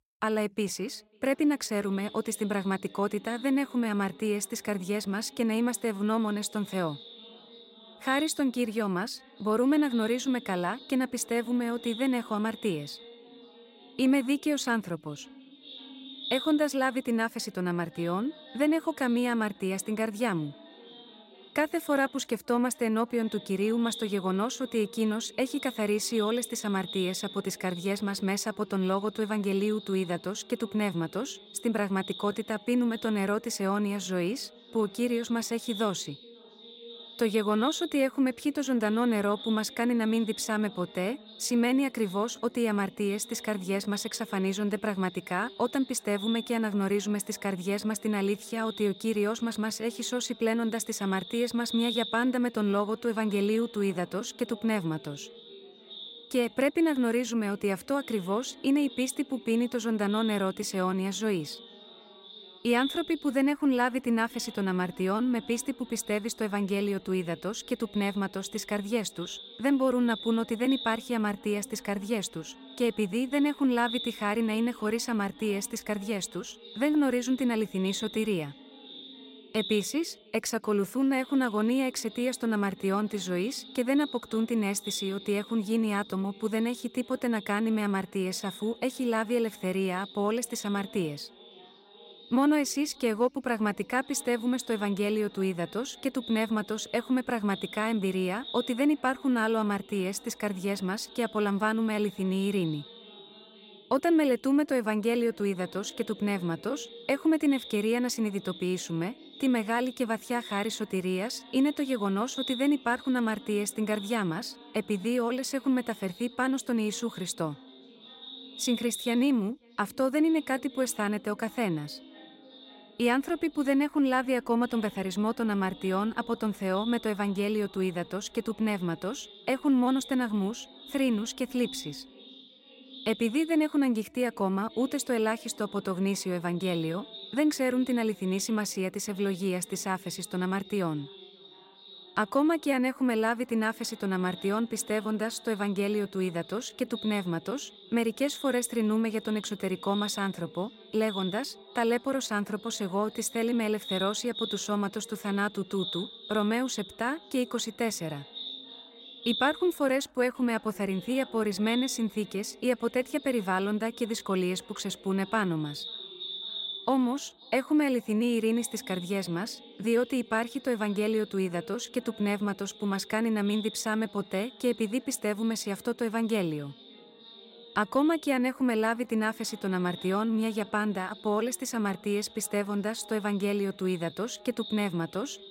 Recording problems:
echo of what is said; noticeable; throughout; 540 ms later, 15 dB below the speech

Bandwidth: 16 kHz